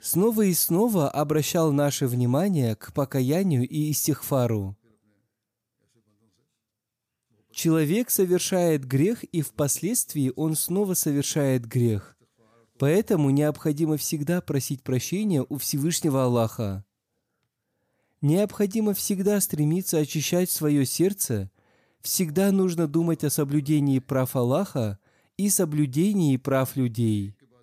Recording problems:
none

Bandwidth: 15 kHz